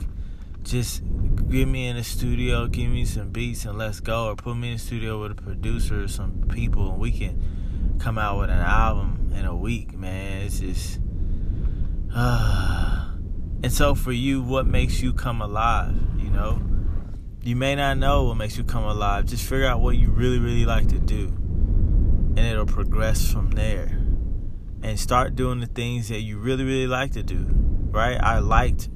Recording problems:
low rumble; noticeable; throughout; 15 dB below the speech

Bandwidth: 14.5 kHz